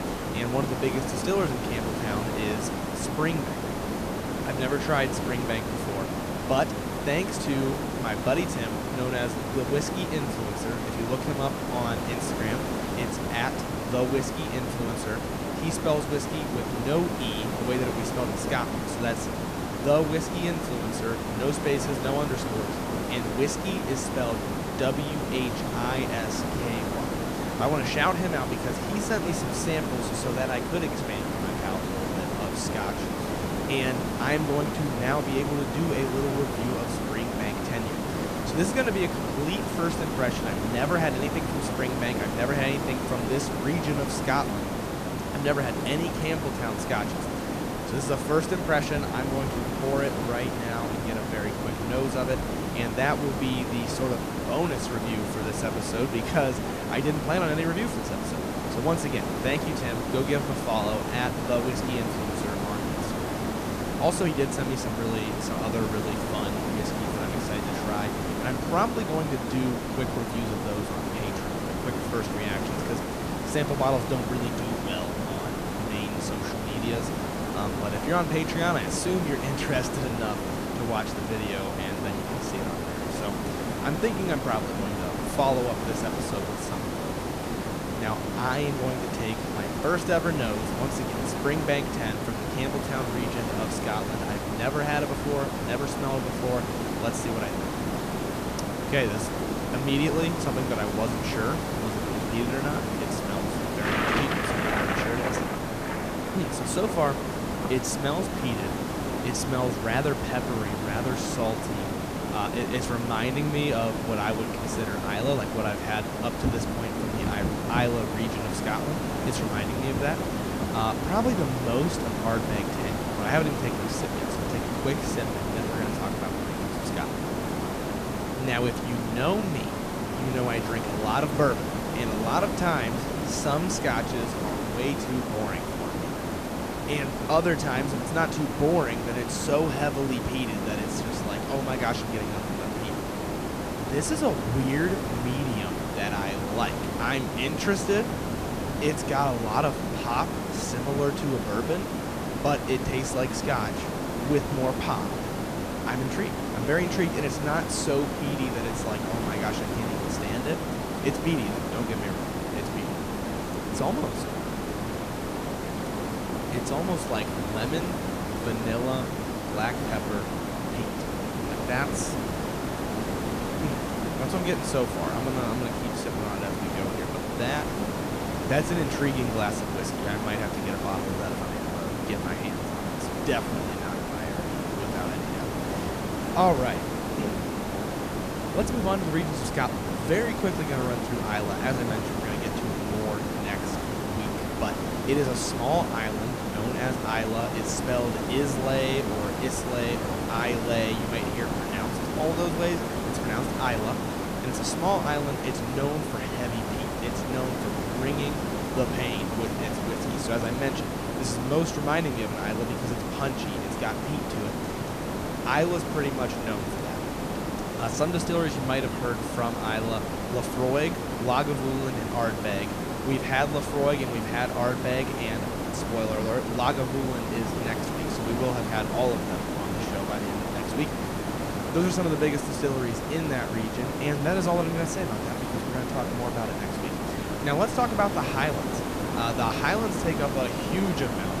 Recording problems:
hiss; loud; throughout; as loud as the speech
rain or running water; noticeable; throughout; 15 dB below the speech

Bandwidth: 14.5 kHz